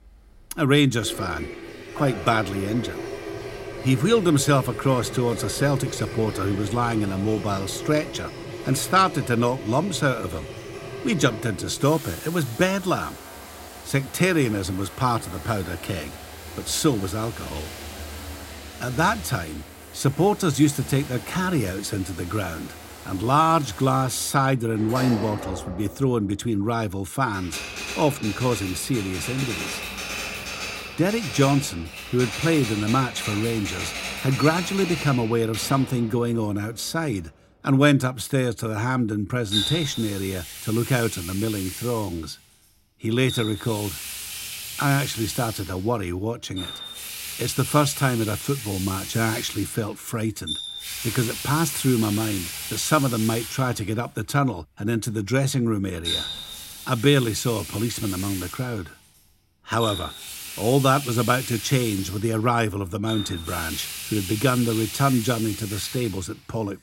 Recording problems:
household noises; loud; throughout; 9 dB below the speech

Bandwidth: 16 kHz